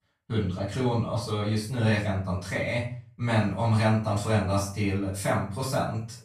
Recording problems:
off-mic speech; far
room echo; noticeable; dies away in 0.4 s

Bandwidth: 13.5 kHz